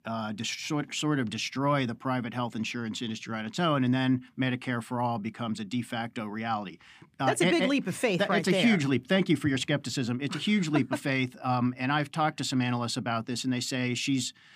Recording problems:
none

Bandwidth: 15 kHz